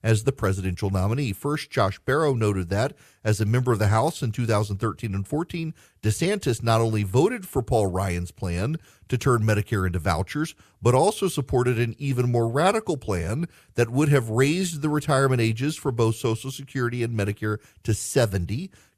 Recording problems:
none

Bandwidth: 14.5 kHz